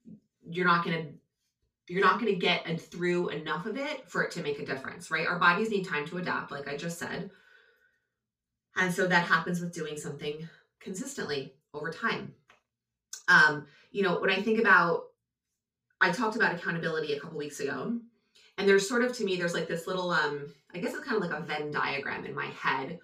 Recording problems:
off-mic speech; far
room echo; slight; dies away in 0.2 s

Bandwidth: 15.5 kHz